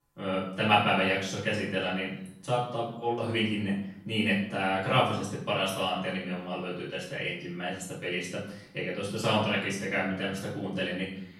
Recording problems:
off-mic speech; far
room echo; noticeable; dies away in 0.6 s

